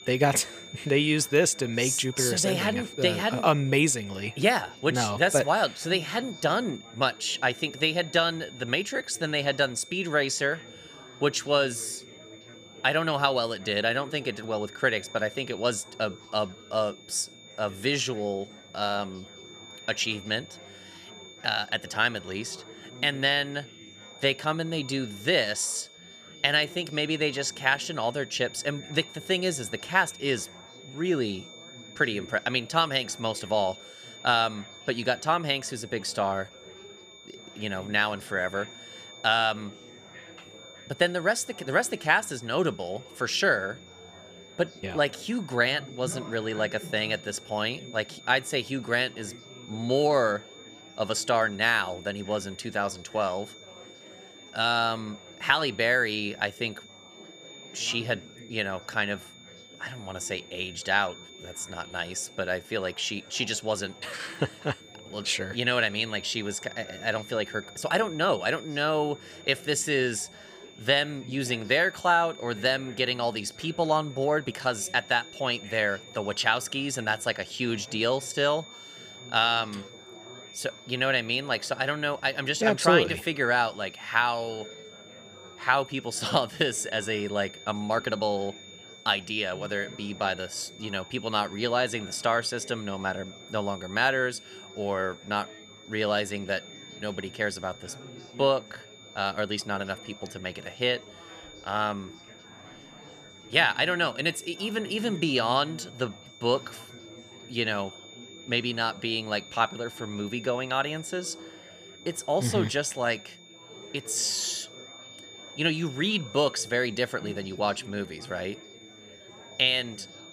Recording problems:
high-pitched whine; noticeable; throughout; 3.5 kHz, 20 dB below the speech
chatter from many people; faint; throughout; 20 dB below the speech
uneven, jittery; strongly; from 1:08 to 1:28

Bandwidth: 15 kHz